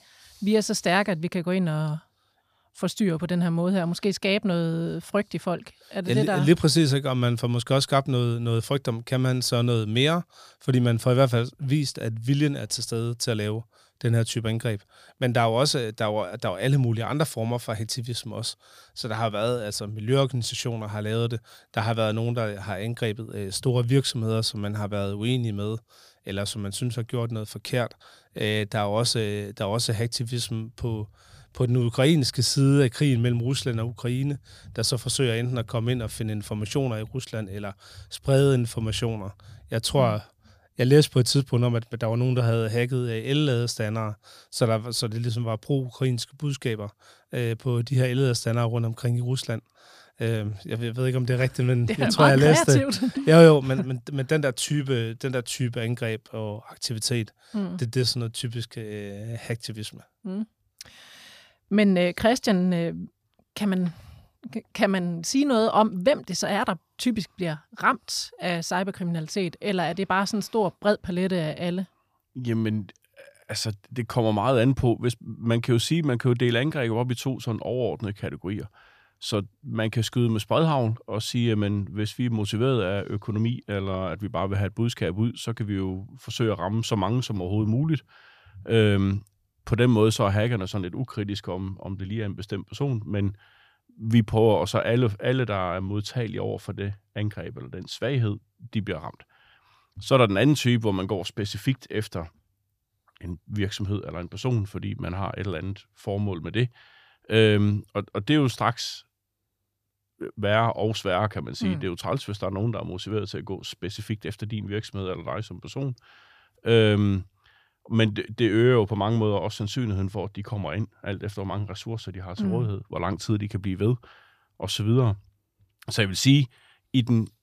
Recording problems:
none

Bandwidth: 15 kHz